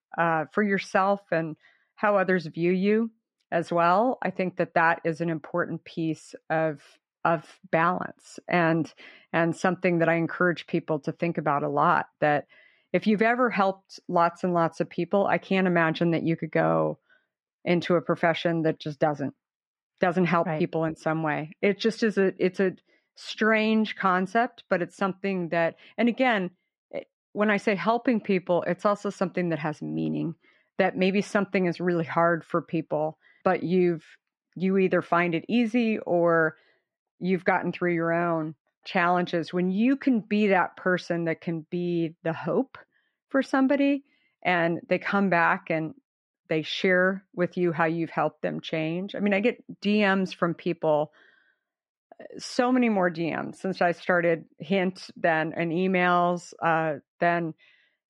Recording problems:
muffled; slightly; fading above 2.5 kHz

